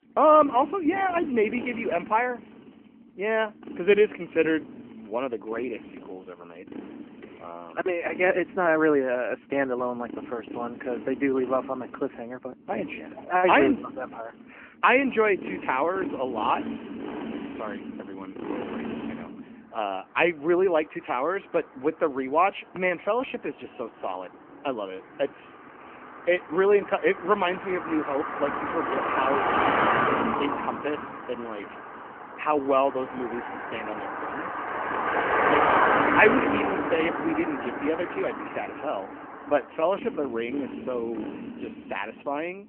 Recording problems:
phone-call audio; nothing above 3 kHz
traffic noise; loud; throughout; 4 dB below the speech

